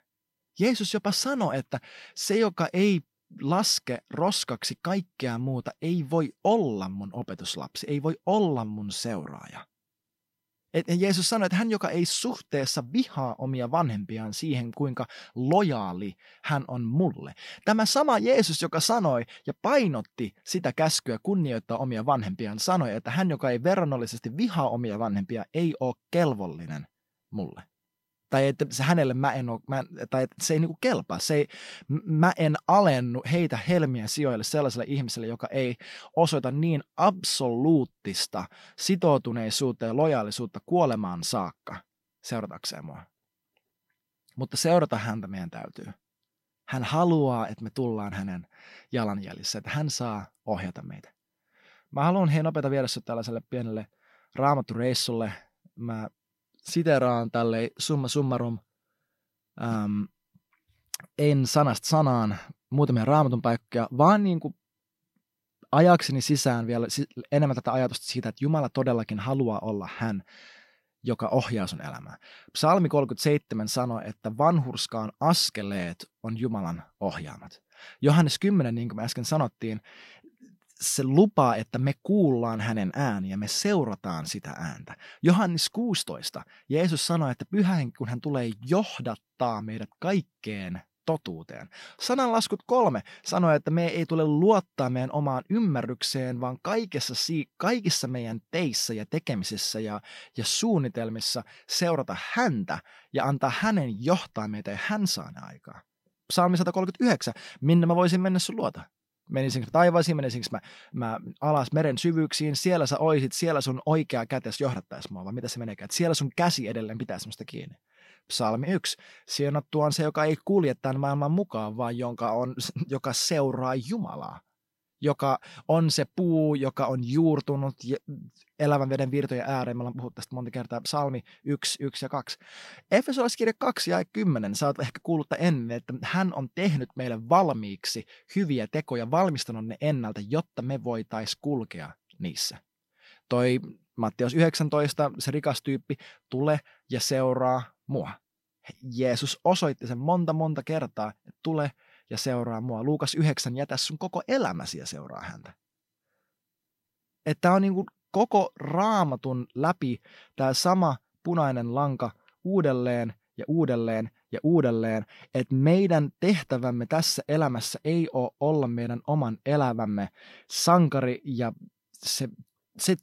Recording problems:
none

